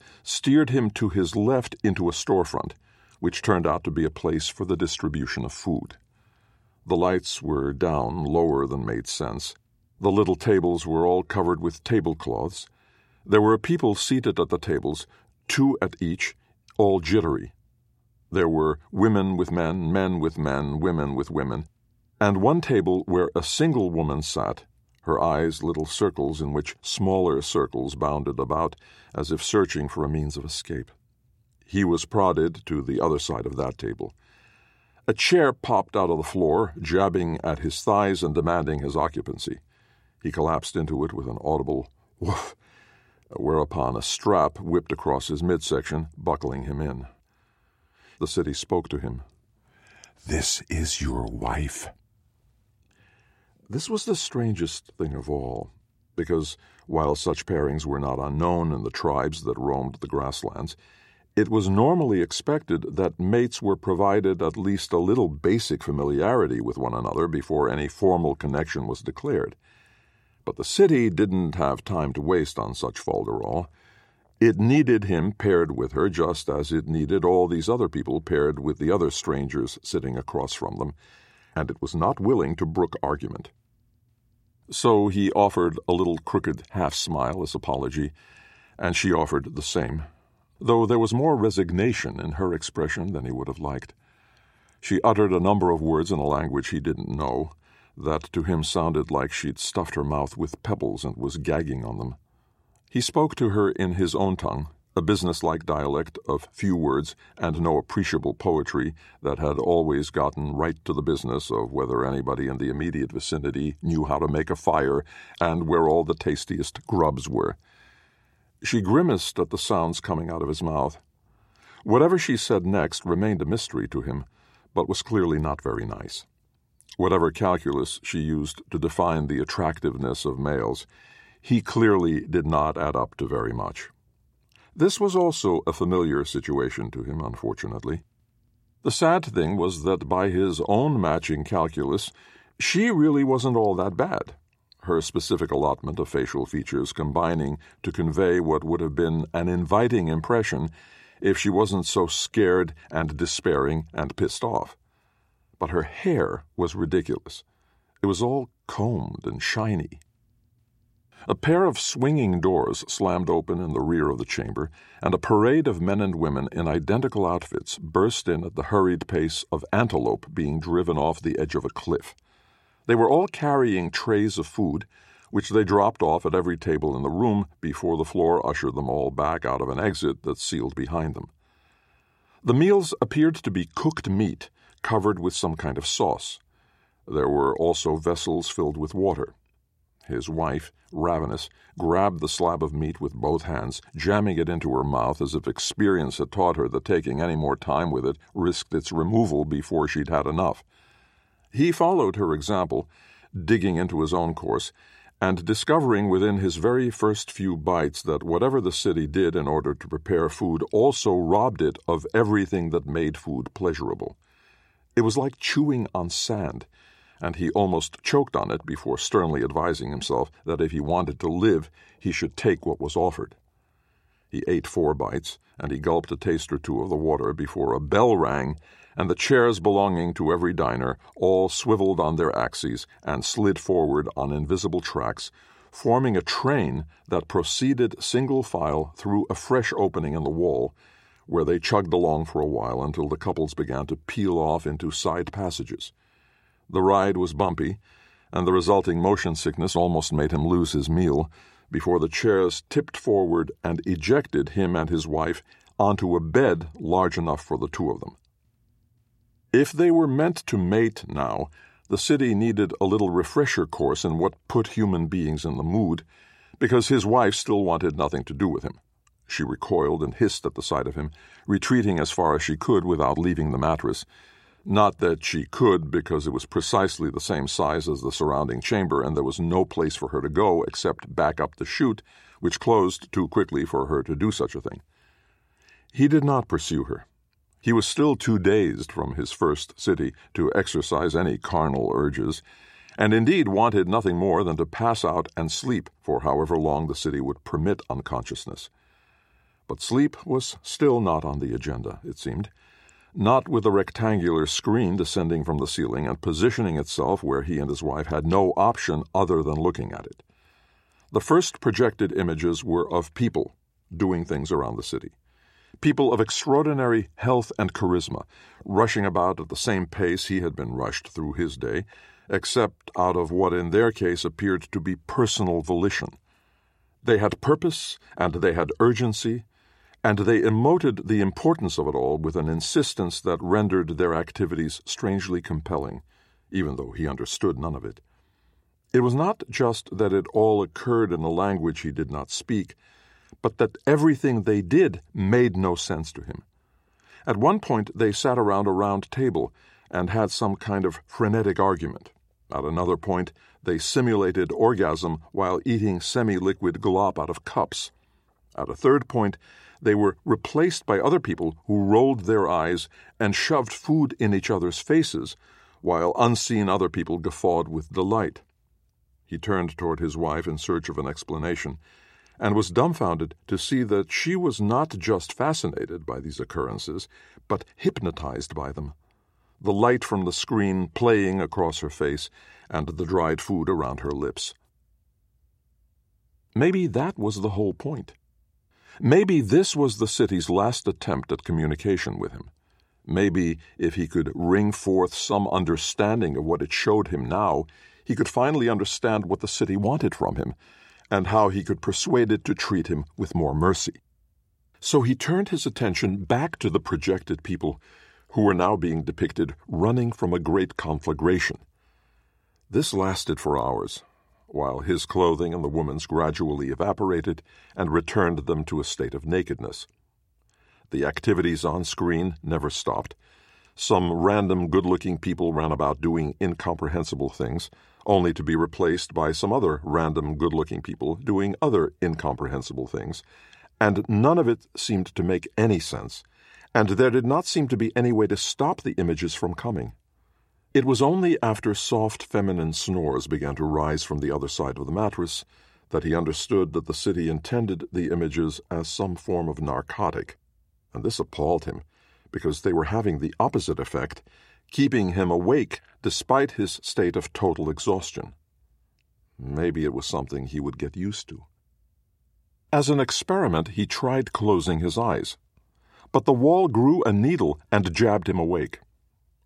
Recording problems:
none

